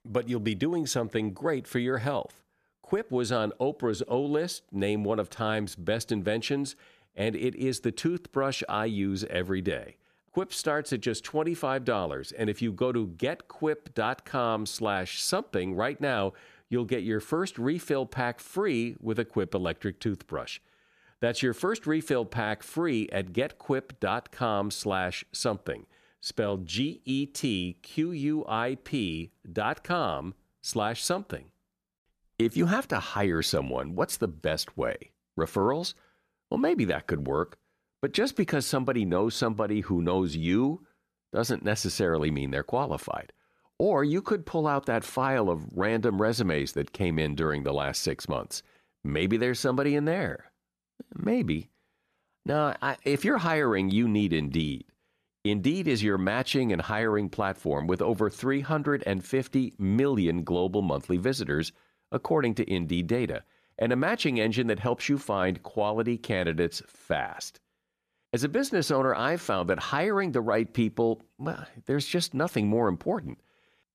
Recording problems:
none

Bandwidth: 14.5 kHz